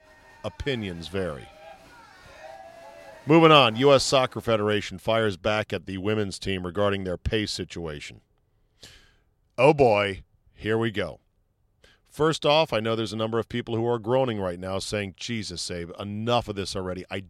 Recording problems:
crowd noise; faint; until 4.5 s; 25 dB below the speech

